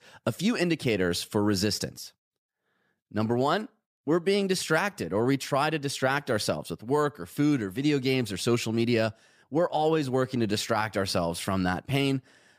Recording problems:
none

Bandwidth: 15 kHz